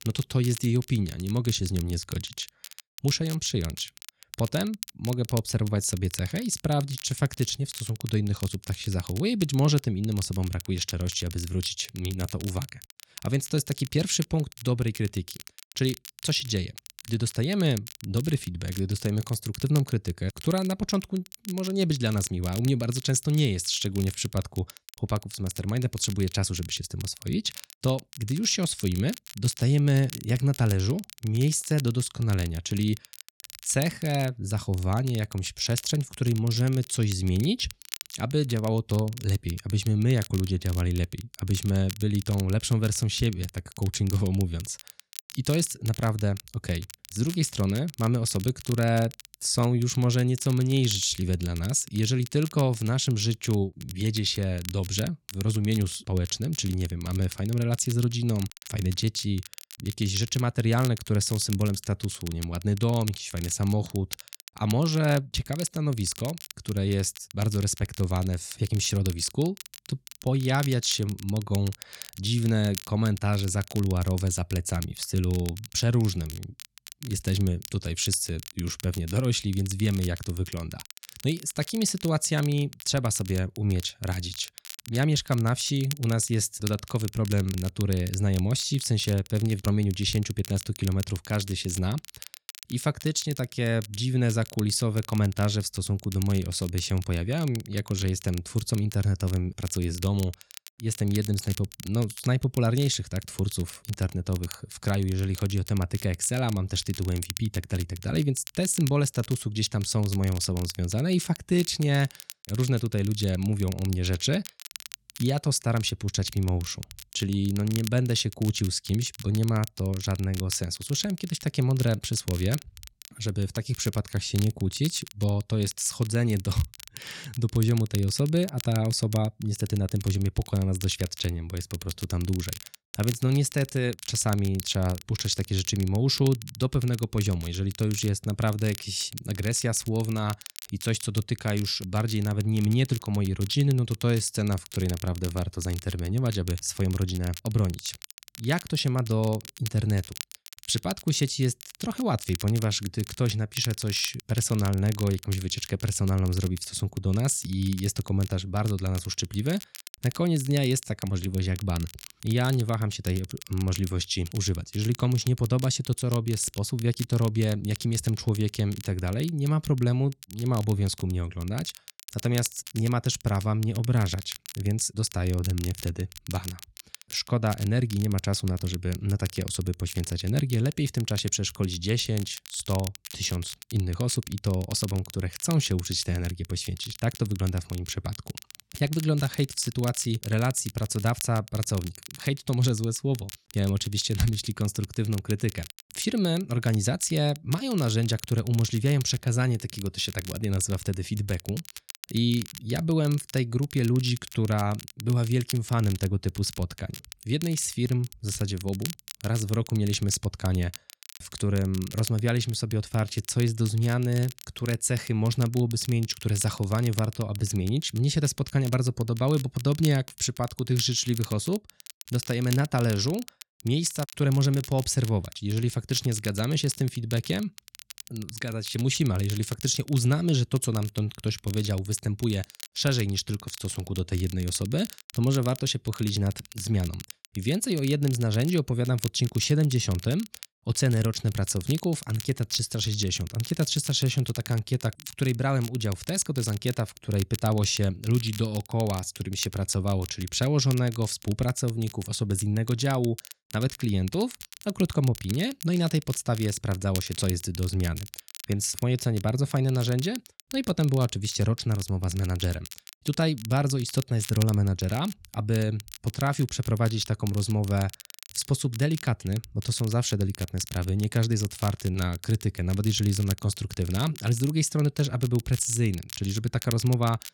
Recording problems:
crackle, like an old record; noticeable; 15 dB below the speech

